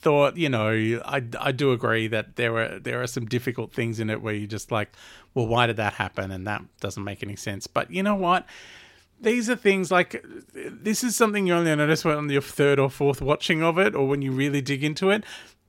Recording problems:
none

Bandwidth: 16 kHz